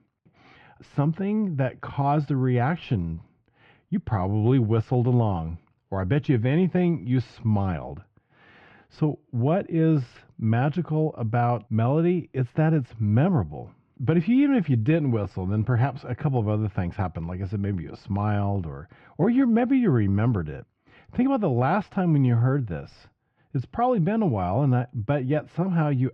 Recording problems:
muffled; very; fading above 2.5 kHz

